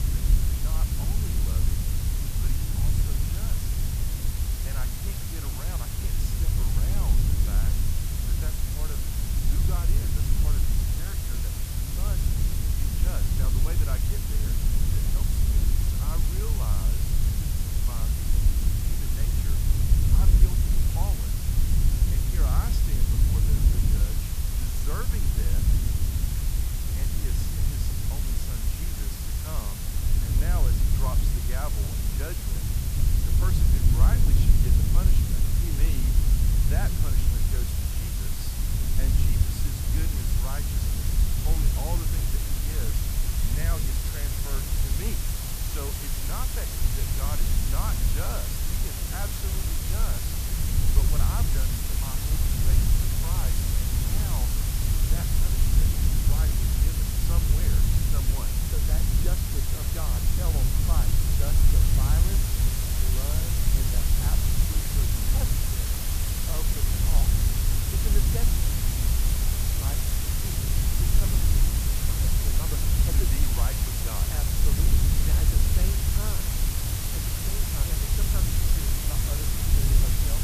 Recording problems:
wind noise on the microphone; heavy; as loud as the speech
hiss; very loud; throughout; 9 dB above the speech
crackle, like an old record; very faint; 25 dB below the speech

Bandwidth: 14.5 kHz